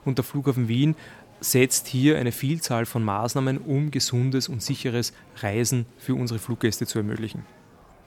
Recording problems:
murmuring crowd; faint; throughout; 25 dB below the speech

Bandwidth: 18.5 kHz